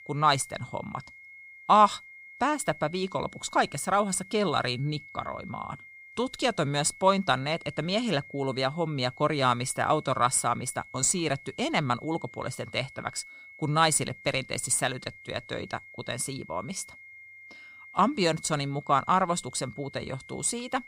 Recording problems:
high-pitched whine; noticeable; throughout; 2 kHz, 20 dB below the speech

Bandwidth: 15.5 kHz